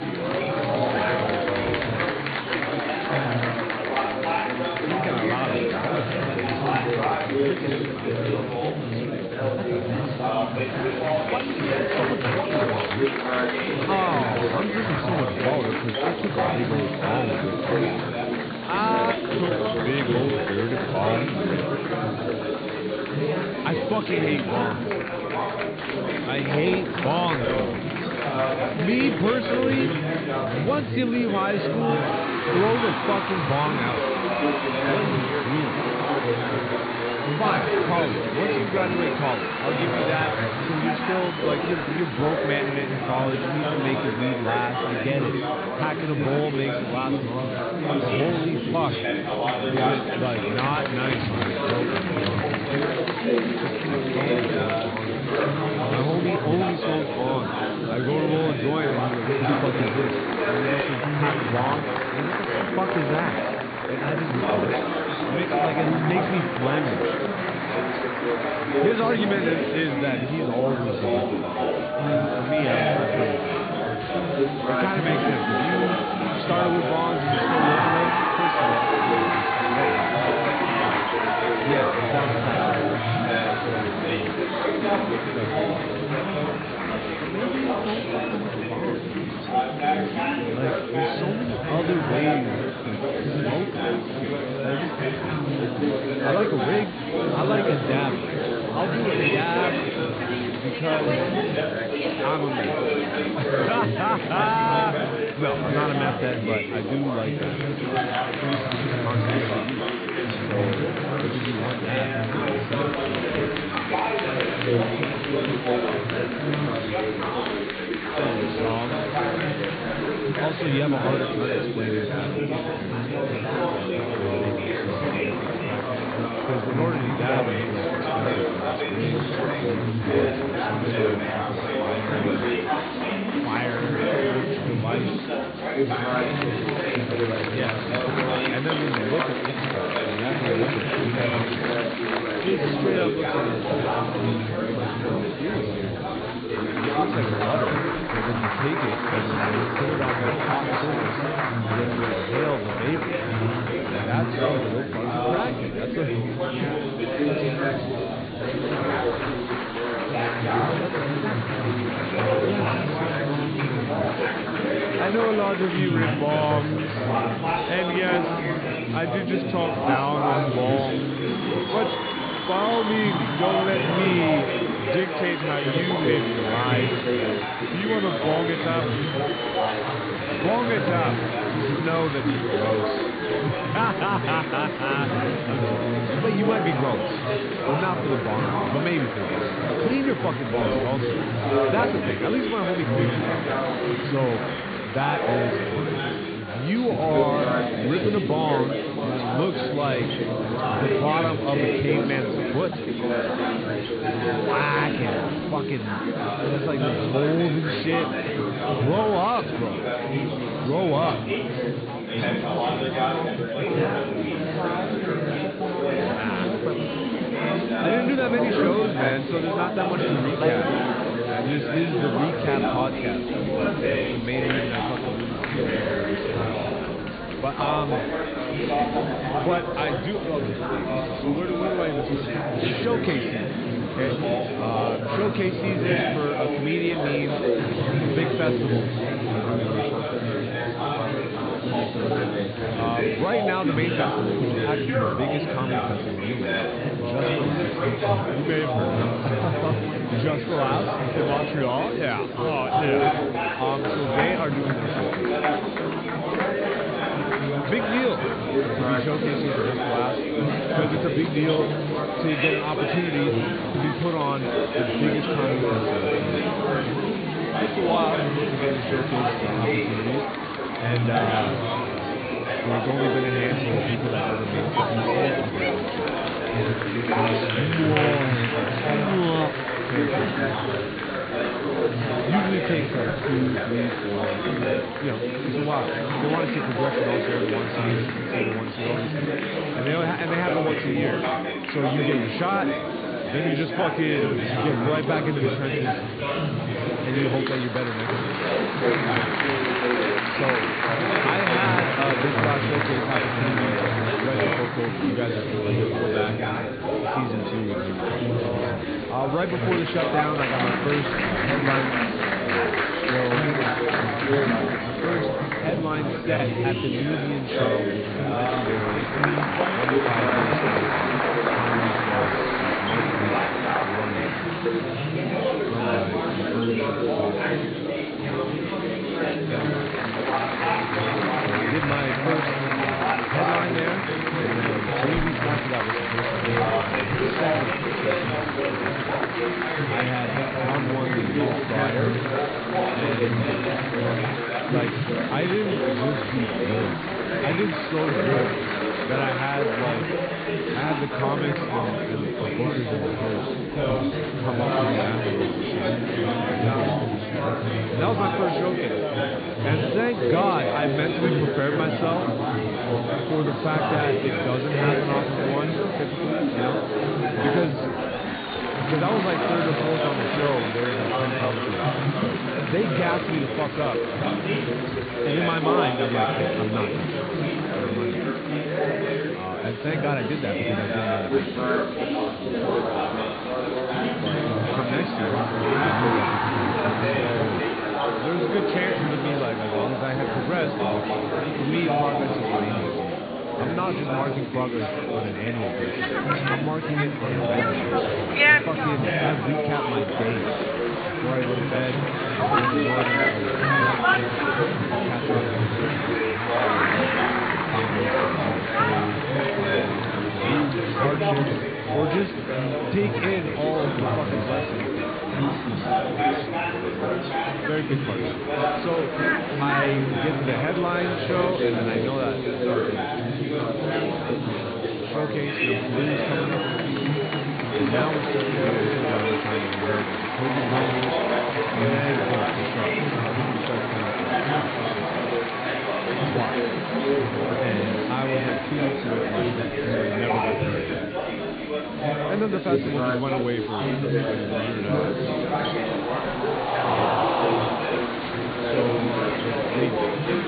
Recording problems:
high frequencies cut off; severe; nothing above 4.5 kHz
chatter from many people; very loud; throughout; 4 dB above the speech

